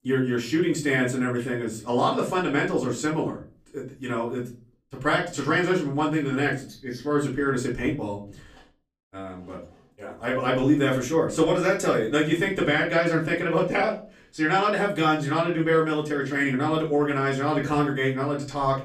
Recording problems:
off-mic speech; far
room echo; slight; dies away in 0.3 s

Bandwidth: 15 kHz